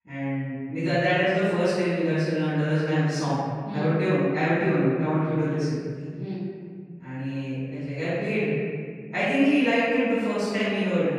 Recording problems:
room echo; strong; dies away in 2 s
off-mic speech; far

